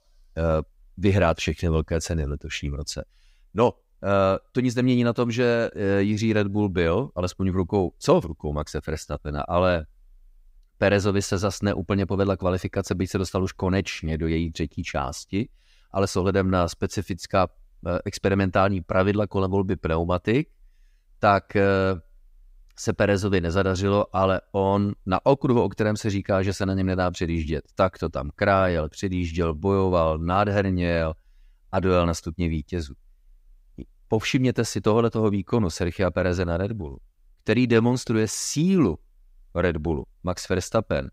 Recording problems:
none

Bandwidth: 15.5 kHz